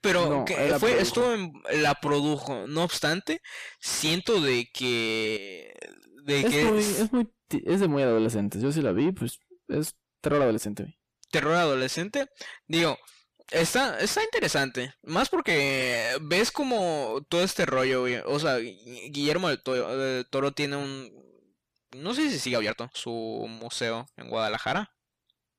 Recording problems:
distortion; heavy; 7 dB below the speech
uneven, jittery; strongly; from 2 to 23 s

